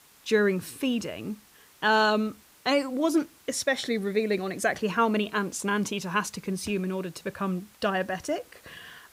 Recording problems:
hiss; faint; throughout; 25 dB below the speech

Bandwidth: 15.5 kHz